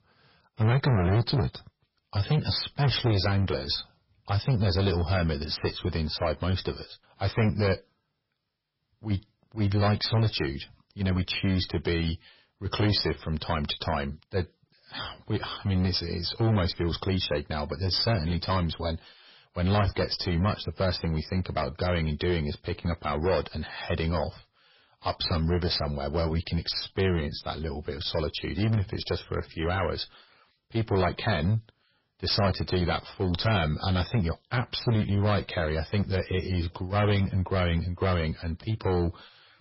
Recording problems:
distortion; heavy; 8% of the sound clipped
garbled, watery; badly; nothing above 5.5 kHz

